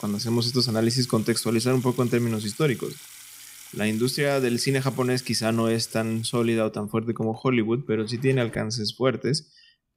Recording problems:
household noises; noticeable; throughout; 20 dB below the speech

